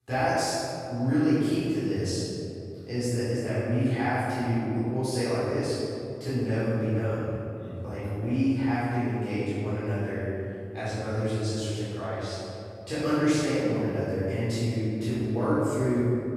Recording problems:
room echo; strong; dies away in 2.7 s
off-mic speech; far

